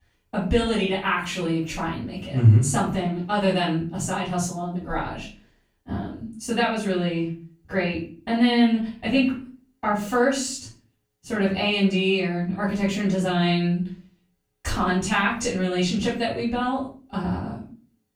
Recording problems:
off-mic speech; far
room echo; noticeable; dies away in 0.4 s

